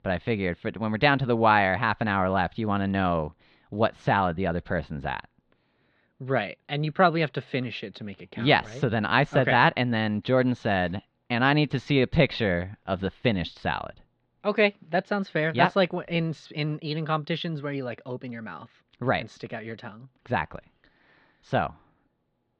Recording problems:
muffled; slightly; fading above 4 kHz

